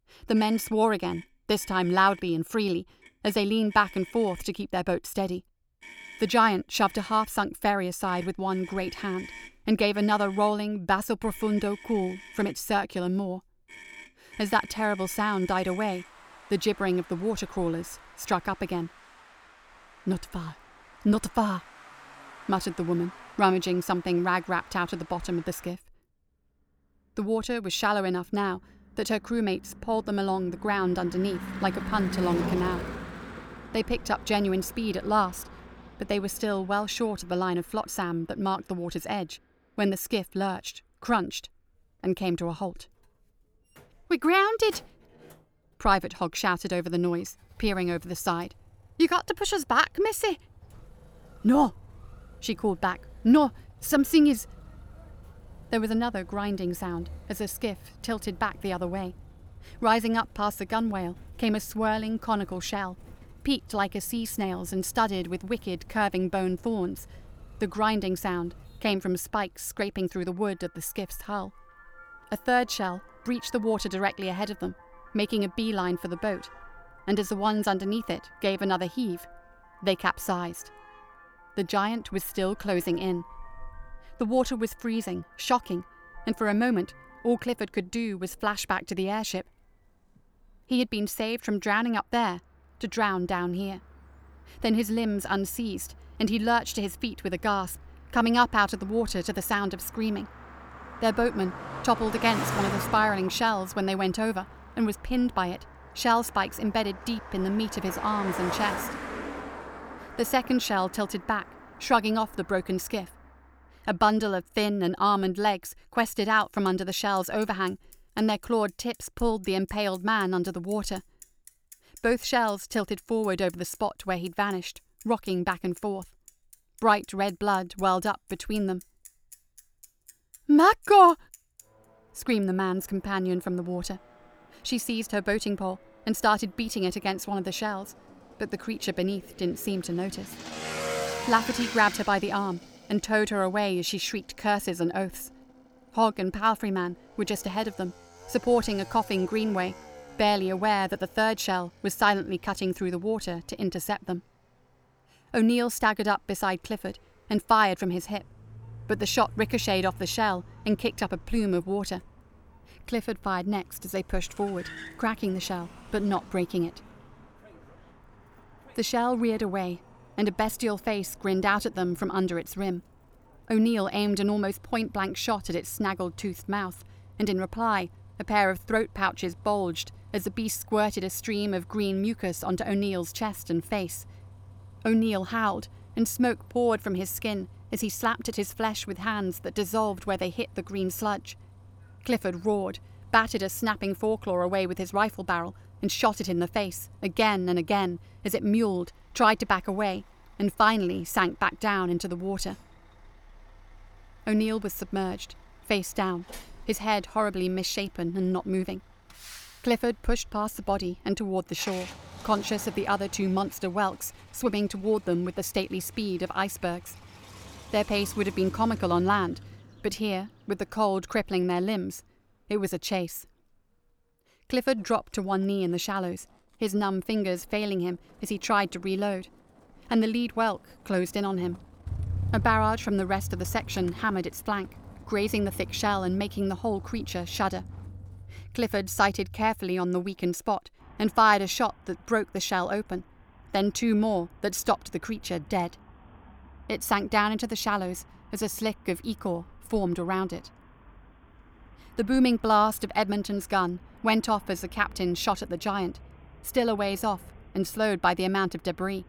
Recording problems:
traffic noise; noticeable; throughout; 15 dB below the speech

